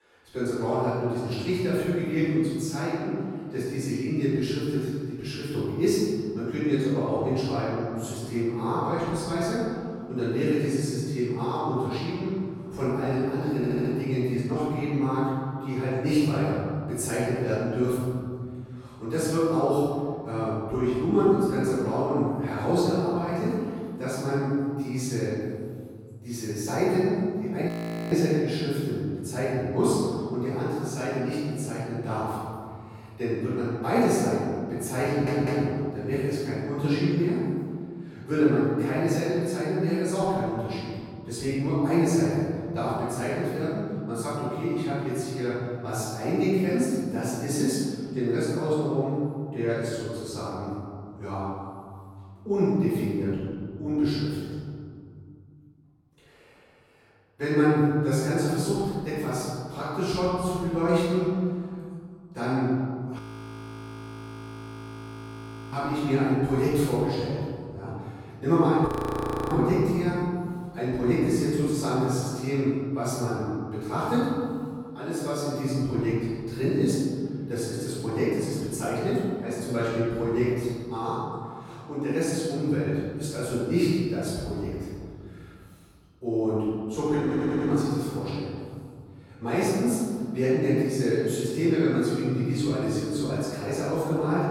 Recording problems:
room echo; strong; dies away in 2.4 s
off-mic speech; far
audio stuttering; at 14 s, at 35 s and at 1:27
audio freezing; at 28 s, at 1:03 for 2.5 s and at 1:09 for 0.5 s

